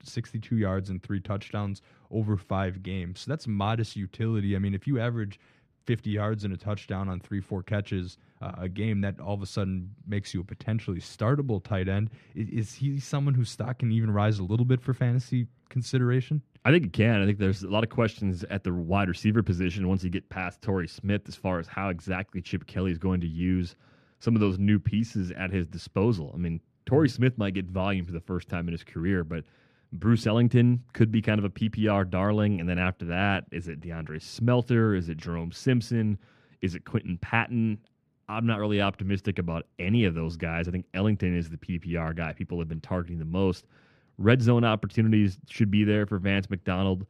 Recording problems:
muffled; very; fading above 3 kHz

